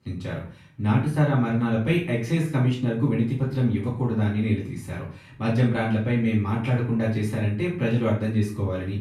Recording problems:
off-mic speech; far
room echo; slight; dies away in 0.4 s

